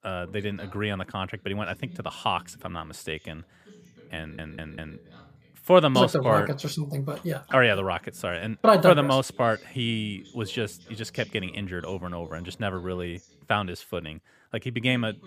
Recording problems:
voice in the background; faint; throughout; 25 dB below the speech
audio stuttering; at 4 s

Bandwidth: 15 kHz